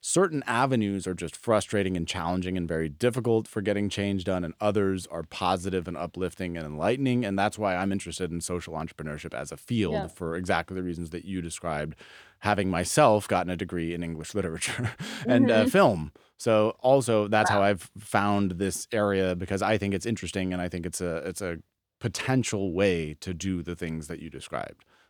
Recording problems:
none

